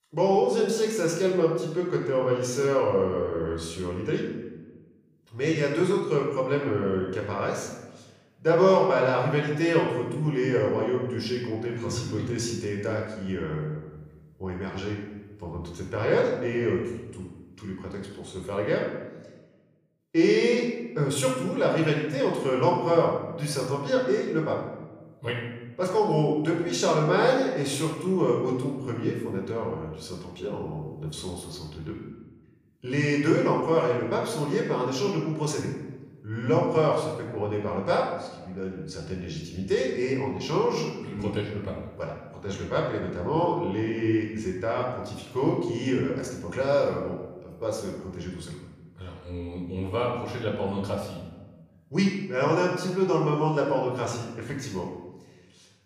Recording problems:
room echo; noticeable; dies away in 0.9 s
off-mic speech; somewhat distant

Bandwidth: 15 kHz